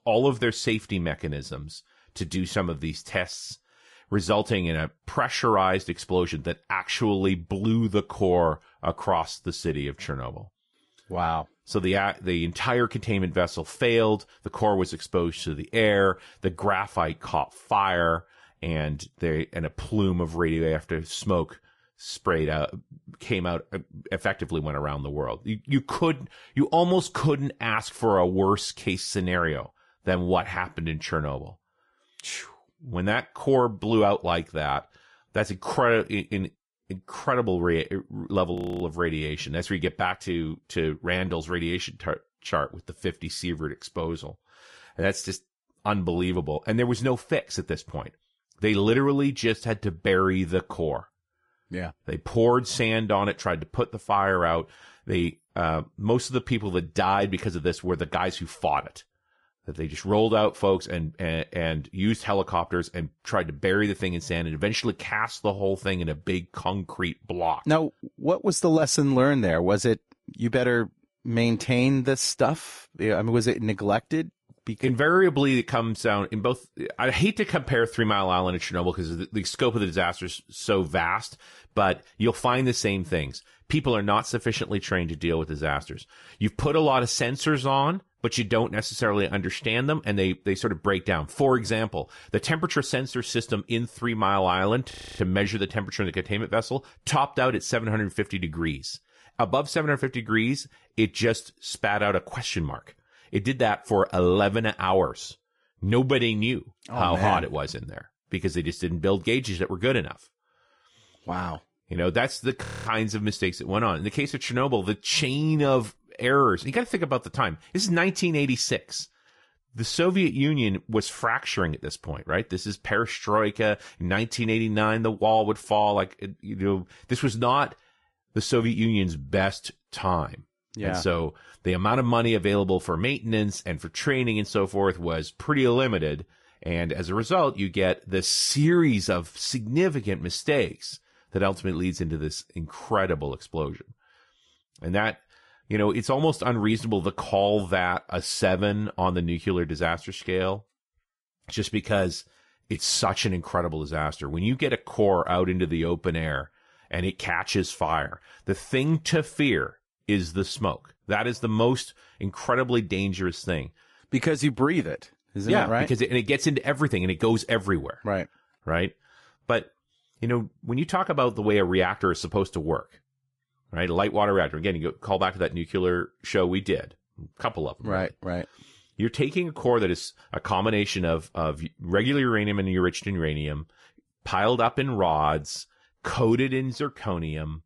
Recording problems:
garbled, watery; slightly; nothing above 11 kHz
audio freezing; at 39 s, at 1:35 and at 1:53

